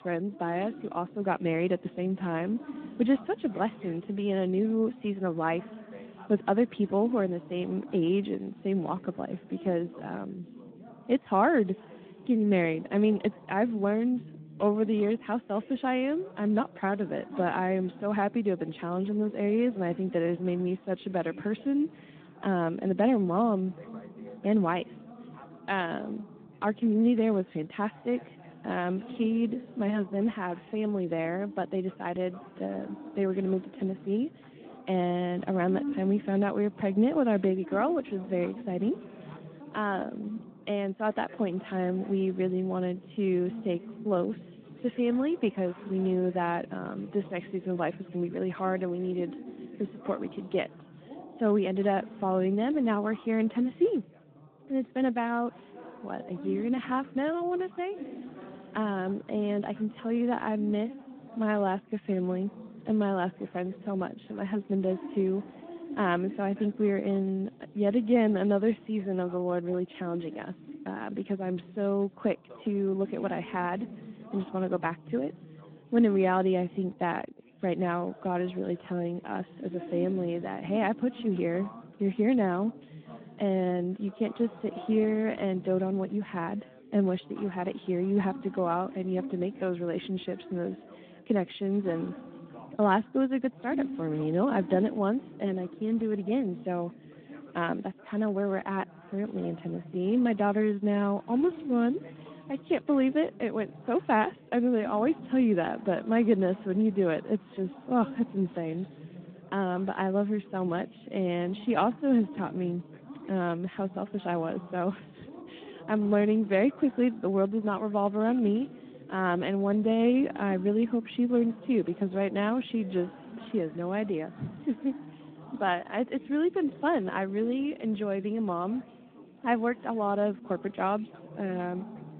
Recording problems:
phone-call audio
background chatter; noticeable; throughout; 3 voices, 15 dB below the speech

